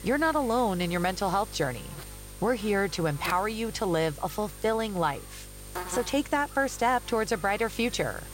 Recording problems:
electrical hum; noticeable; throughout; 50 Hz, 15 dB below the speech

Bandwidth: 16 kHz